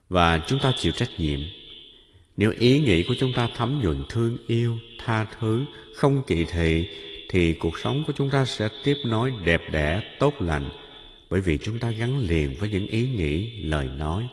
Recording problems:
echo of what is said; noticeable; throughout; 130 ms later, 15 dB below the speech
garbled, watery; slightly; nothing above 11 kHz

